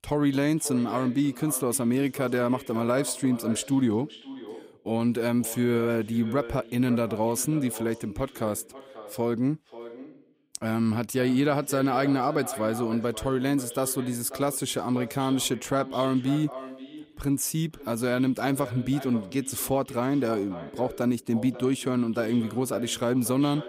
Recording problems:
echo of what is said; noticeable; throughout; 540 ms later, 15 dB below the speech

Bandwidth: 15.5 kHz